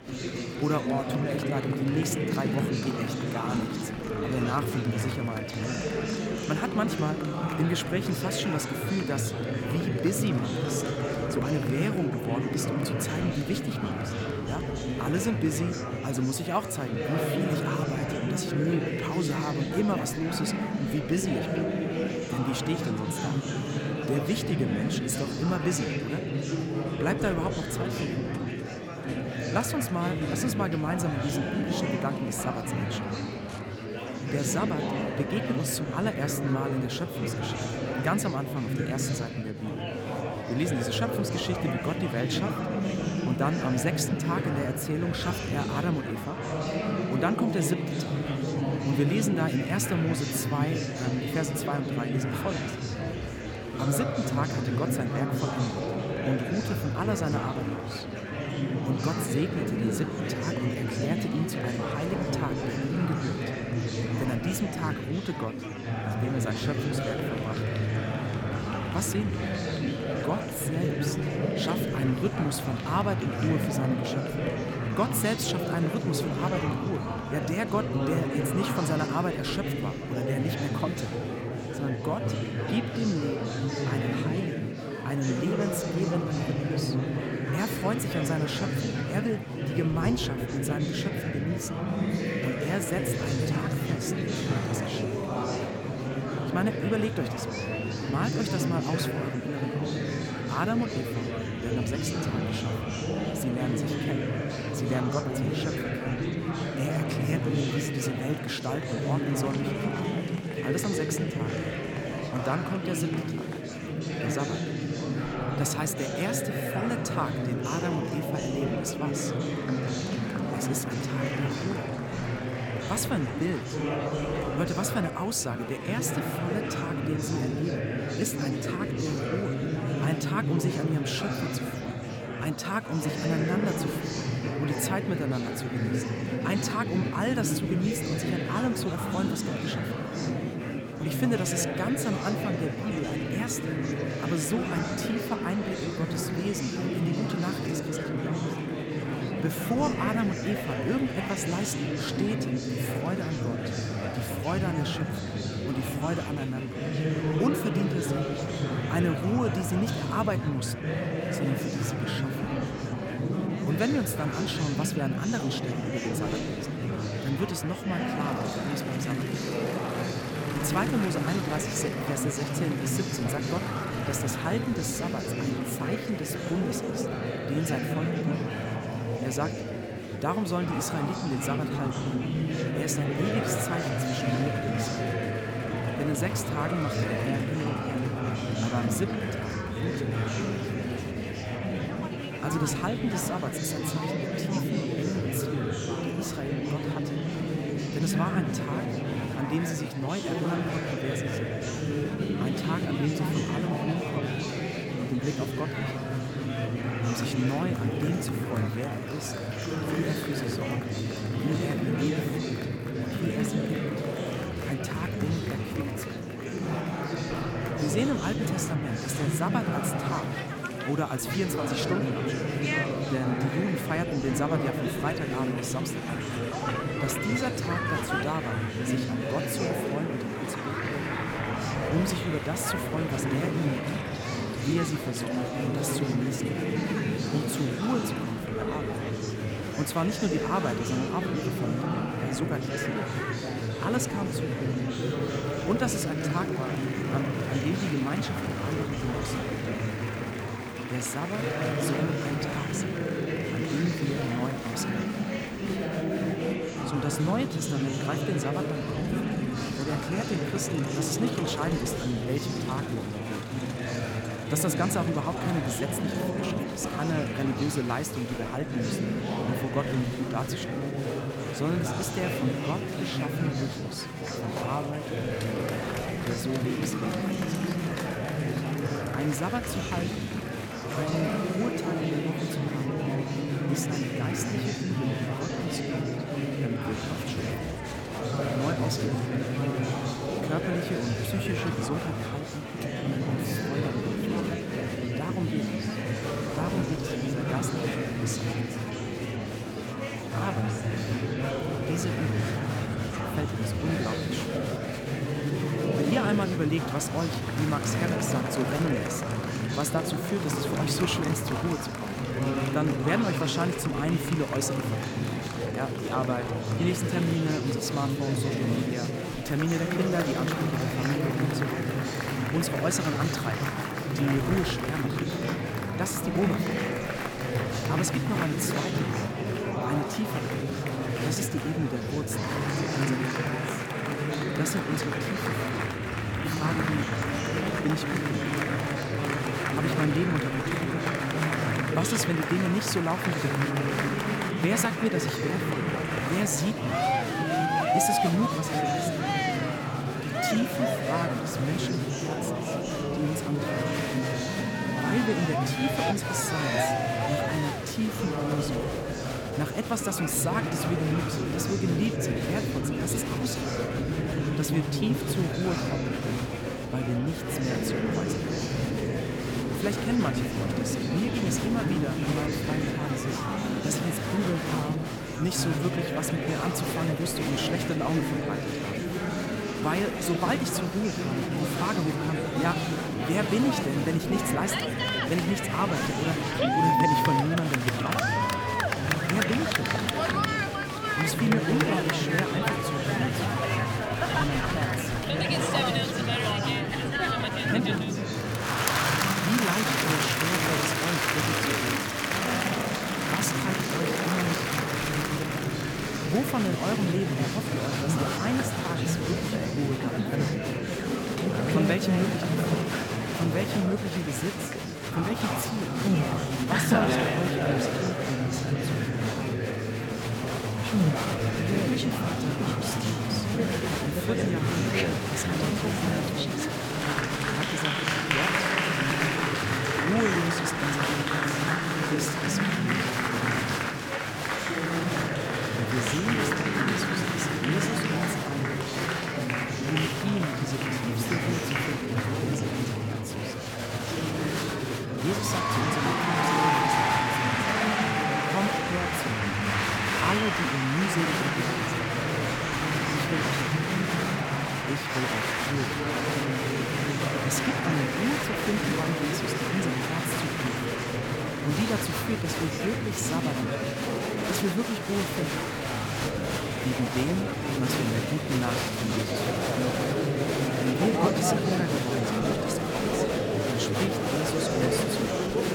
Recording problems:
murmuring crowd; very loud; throughout; 3 dB above the speech

